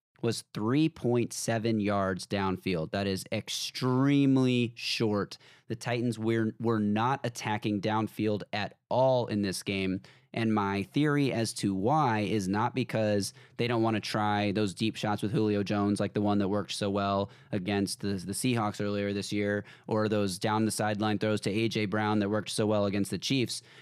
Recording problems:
none

